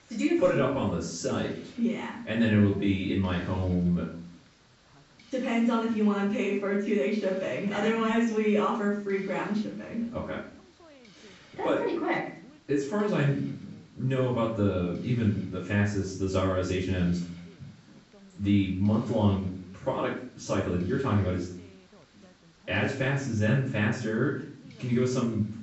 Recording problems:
off-mic speech; far
room echo; noticeable; dies away in 0.5 s
high frequencies cut off; noticeable; nothing above 7.5 kHz
voice in the background; faint; throughout; 30 dB below the speech
hiss; faint; throughout; 30 dB below the speech

